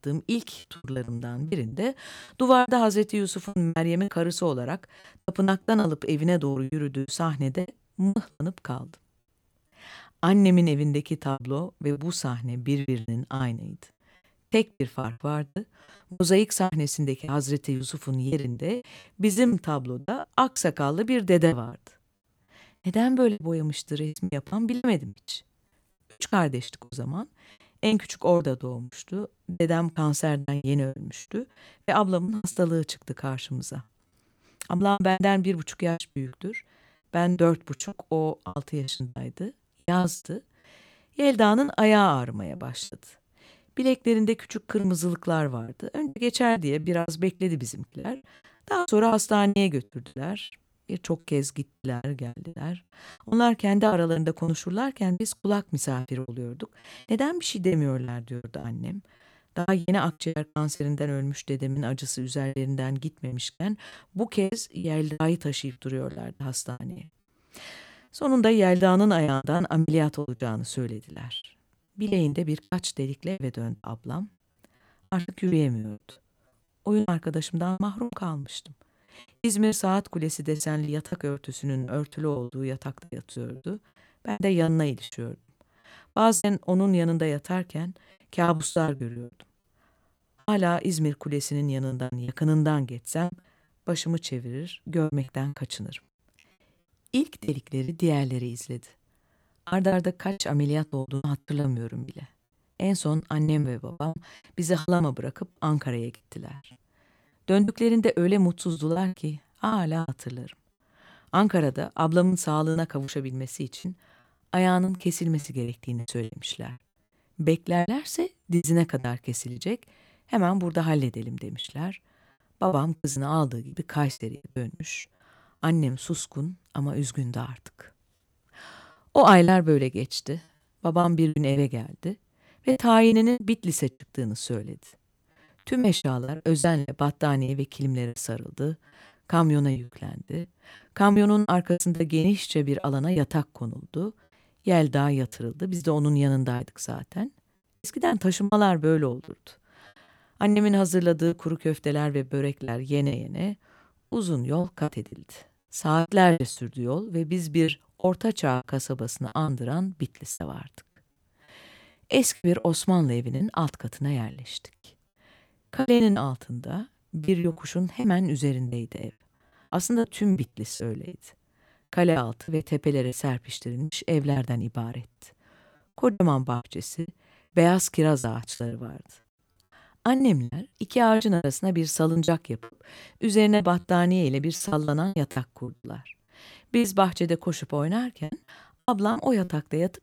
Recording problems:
choppy; very; 13% of the speech affected

